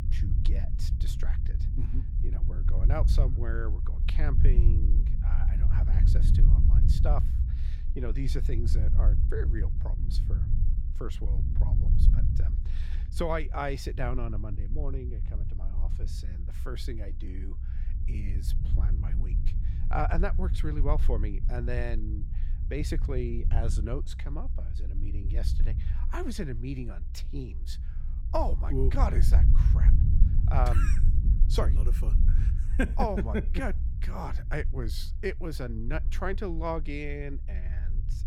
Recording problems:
low rumble; noticeable; throughout; 10 dB below the speech

